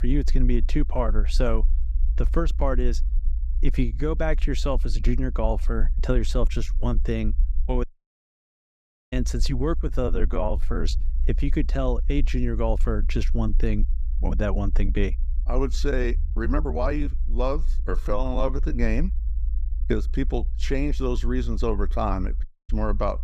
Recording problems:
low rumble; faint; throughout; 20 dB below the speech
uneven, jittery; strongly; from 6.5 to 19 s
audio cutting out; at 8 s for 1.5 s and at 22 s

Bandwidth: 15.5 kHz